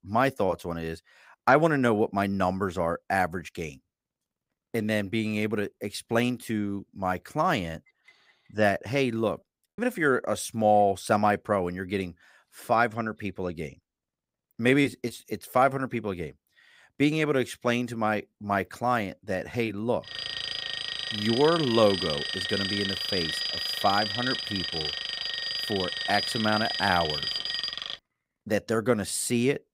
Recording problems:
choppy; very; at 9.5 s; 7% of the speech affected
alarm; noticeable; from 20 to 28 s; peak level with the speech

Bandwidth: 15.5 kHz